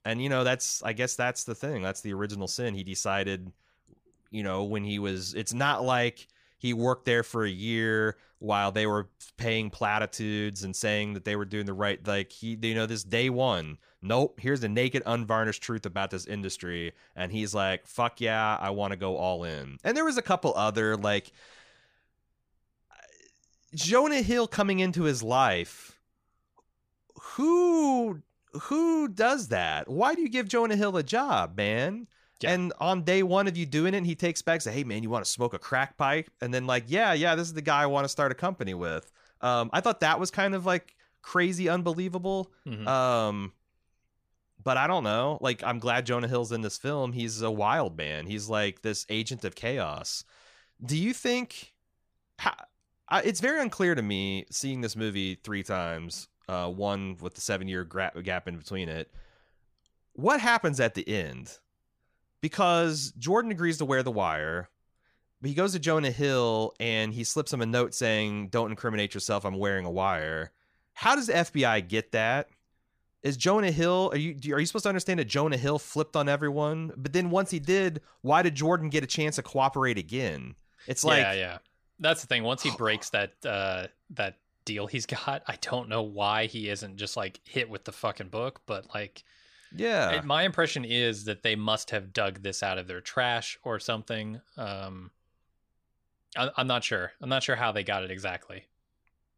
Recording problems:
none

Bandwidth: 15 kHz